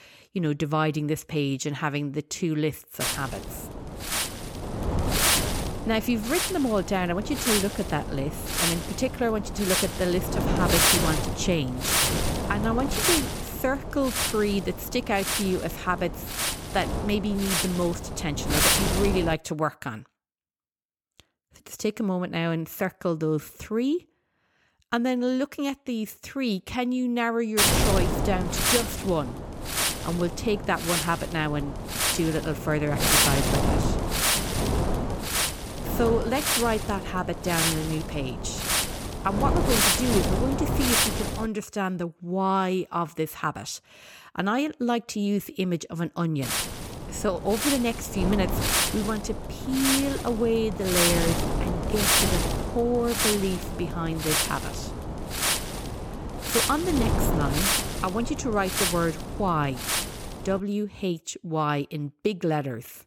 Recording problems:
wind noise on the microphone; heavy; from 3 to 19 s, from 28 to 41 s and from 46 s to 1:01; 3 dB above the speech

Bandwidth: 17 kHz